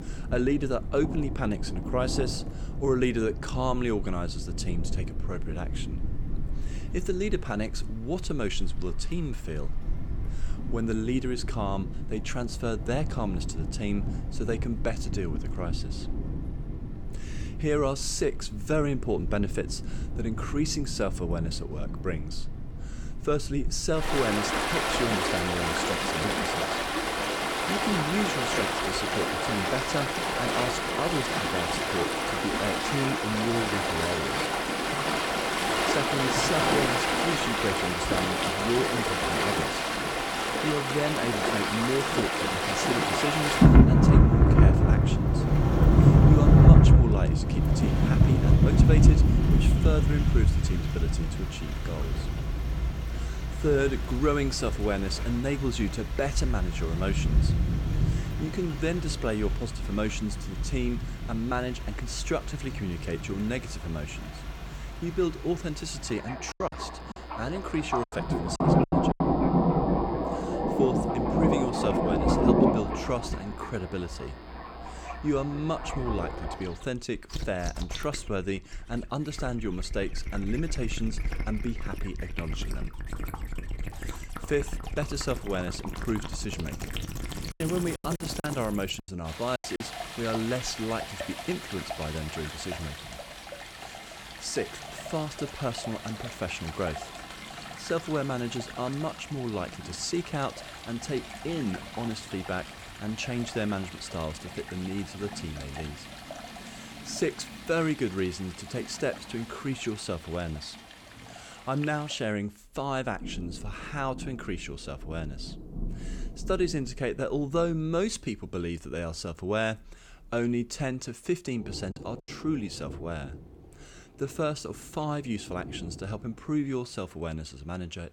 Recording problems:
rain or running water; very loud; throughout; 5 dB above the speech
choppy; very; from 1:07 to 1:09, from 1:28 to 1:30 and at 2:02; 12% of the speech affected

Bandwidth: 18 kHz